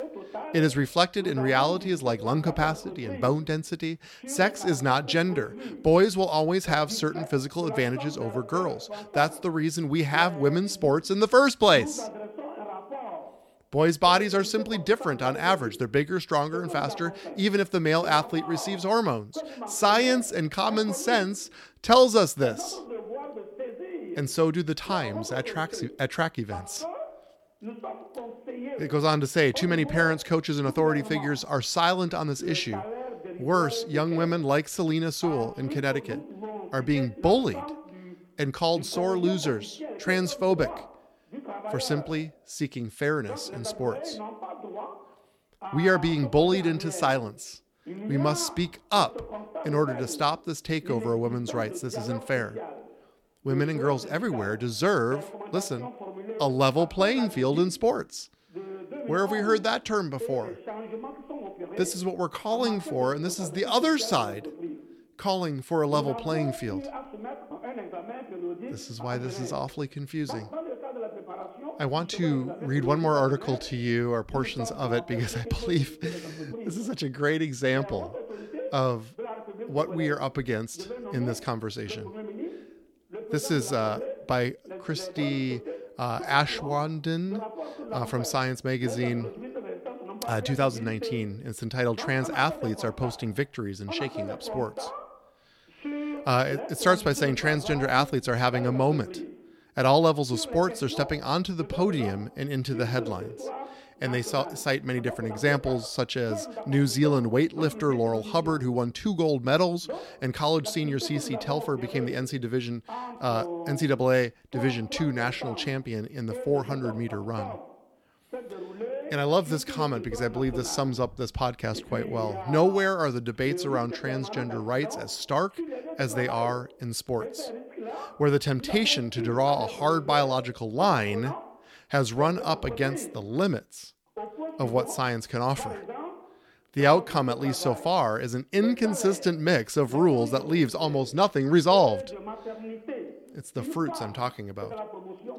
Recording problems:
voice in the background; noticeable; throughout; 10 dB below the speech

